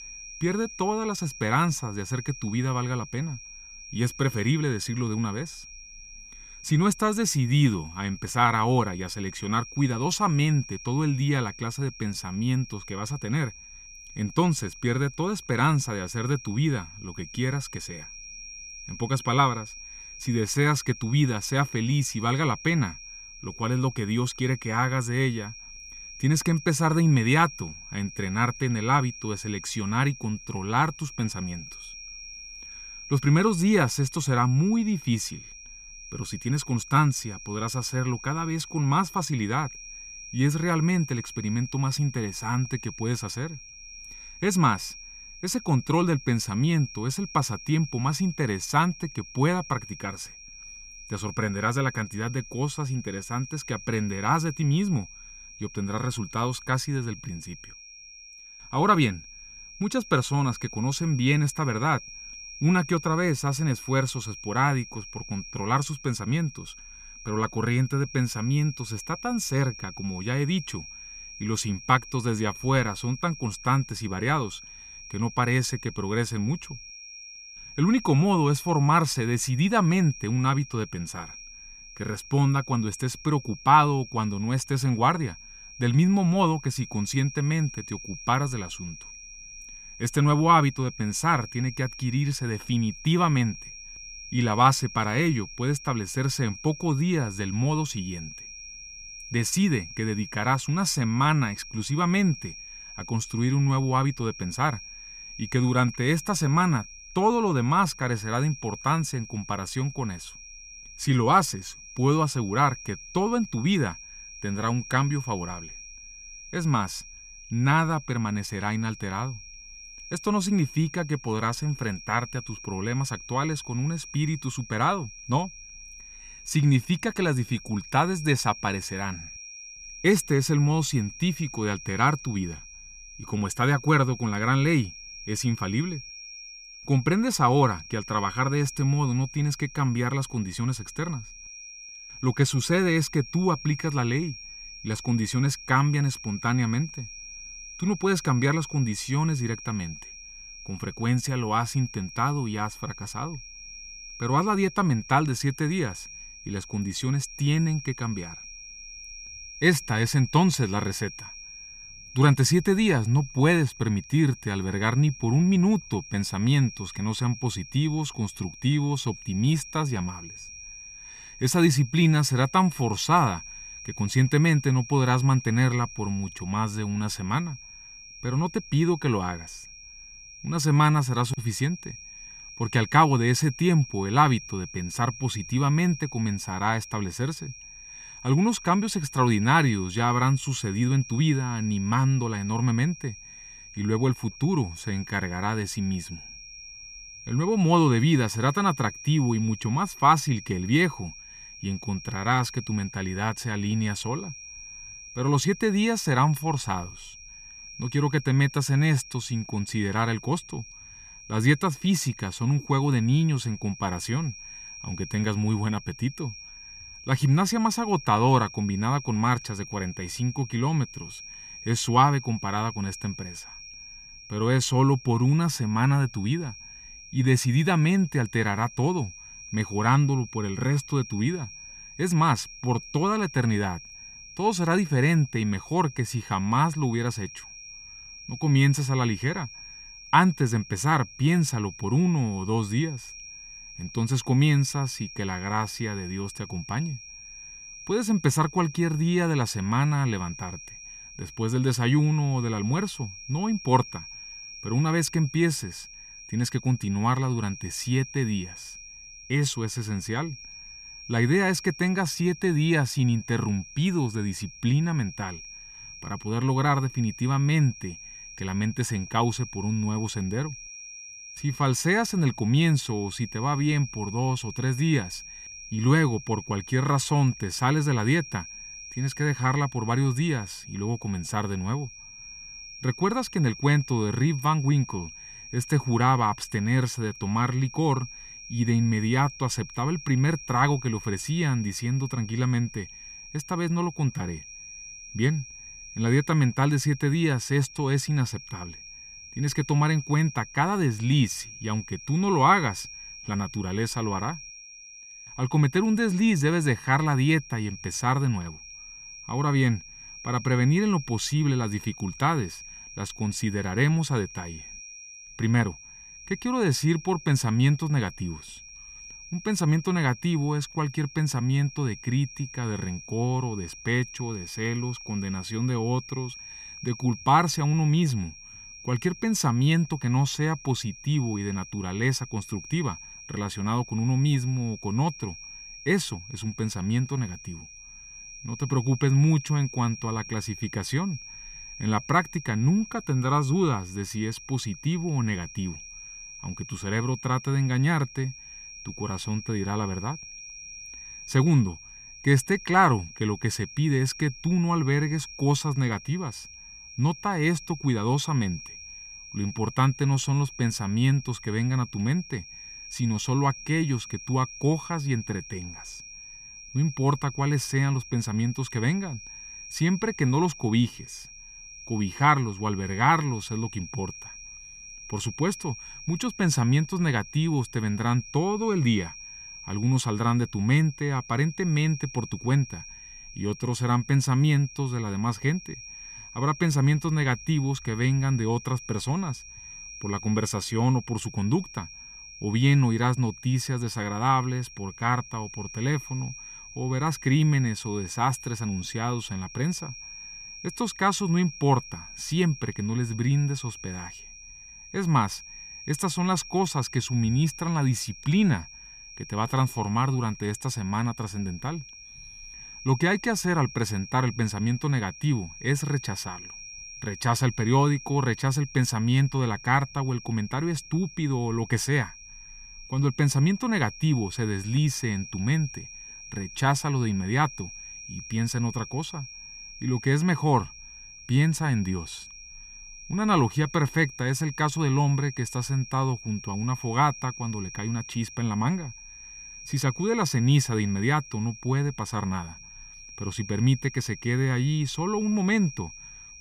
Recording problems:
high-pitched whine; noticeable; throughout; 5.5 kHz, 15 dB below the speech

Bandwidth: 14.5 kHz